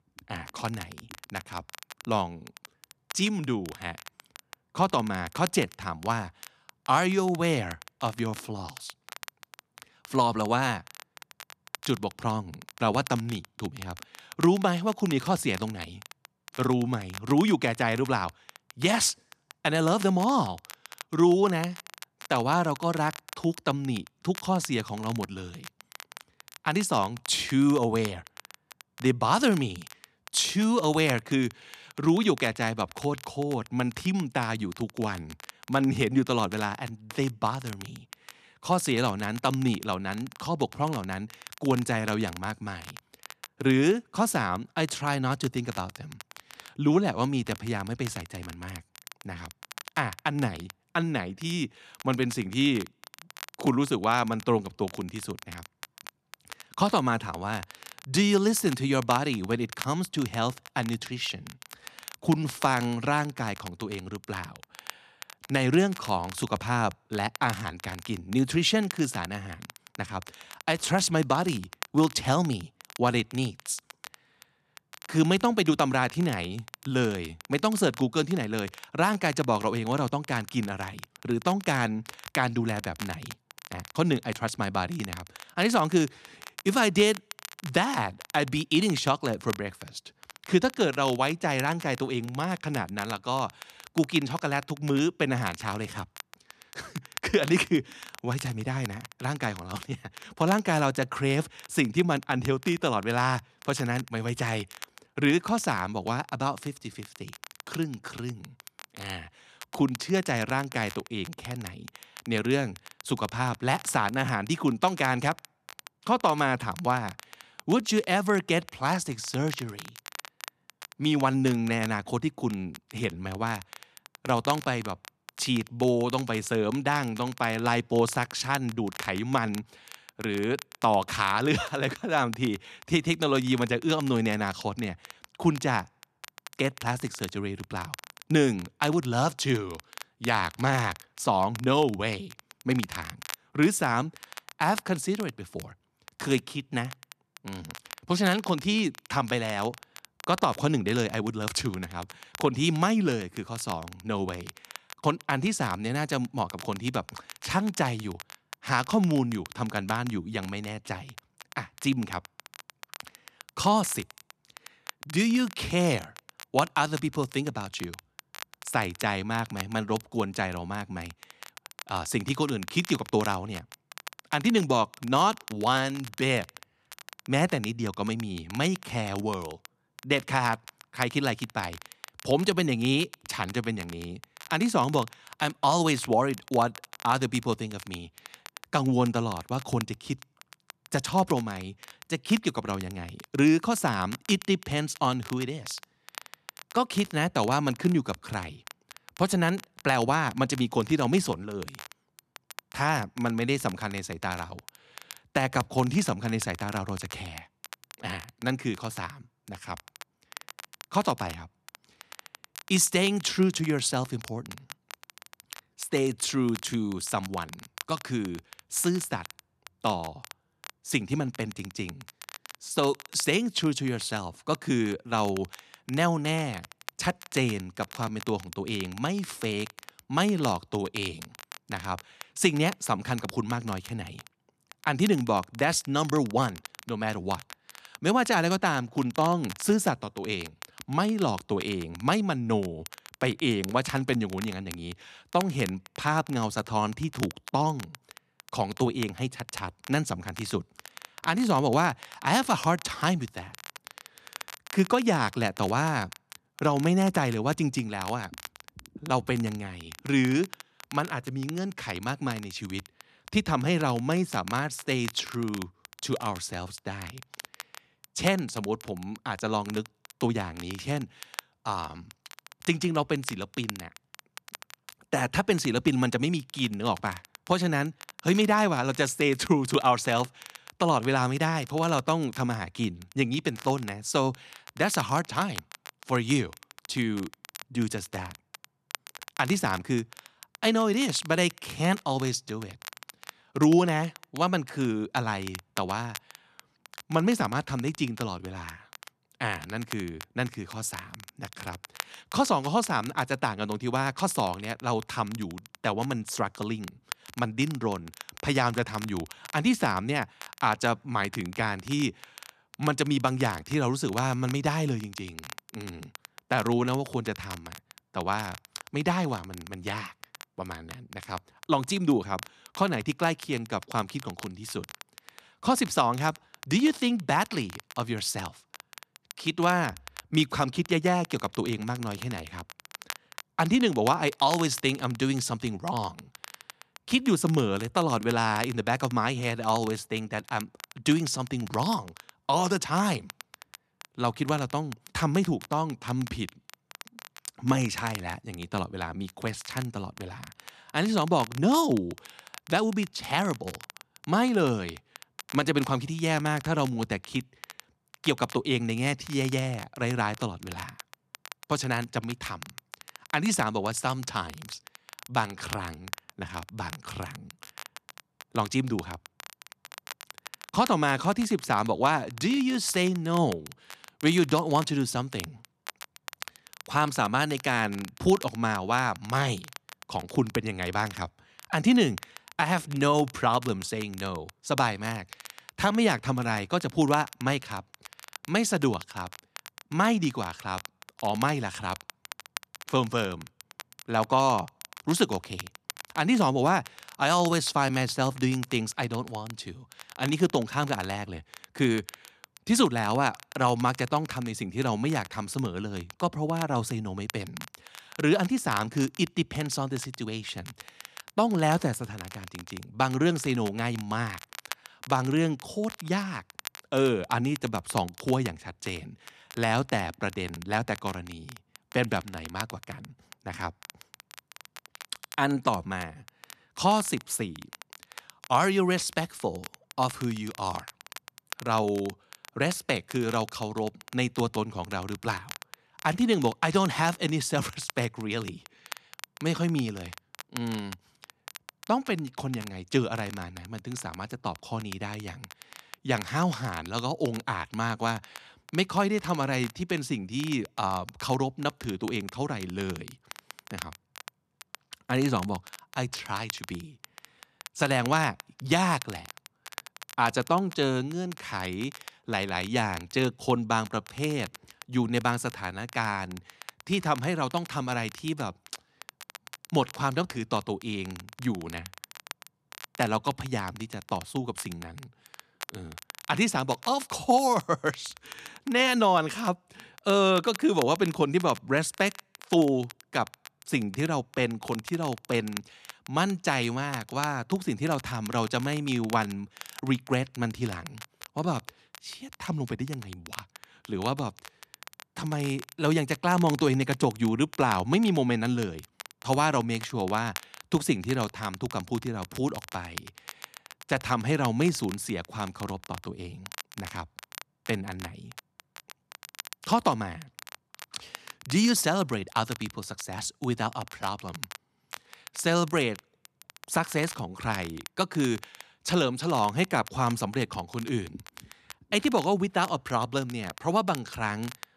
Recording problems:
crackle, like an old record; noticeable; 15 dB below the speech

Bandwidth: 14 kHz